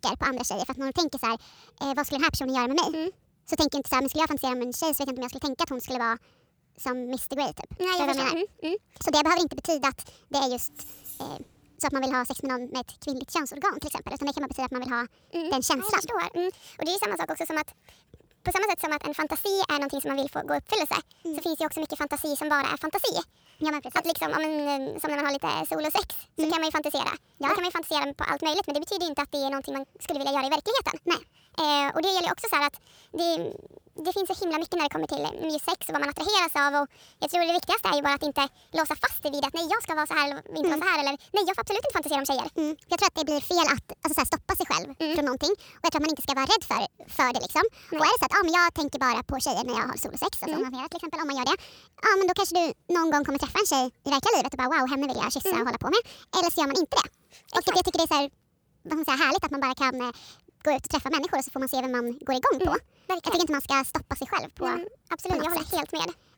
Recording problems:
wrong speed and pitch; too fast and too high; 1.5 times normal speed
jangling keys; faint; at 11 s; peak 15 dB below the speech

